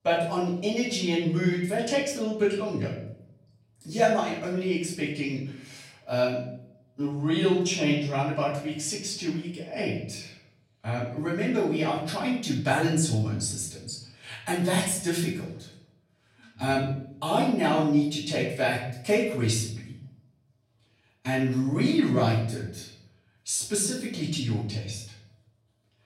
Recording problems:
off-mic speech; far
room echo; noticeable; dies away in 0.6 s

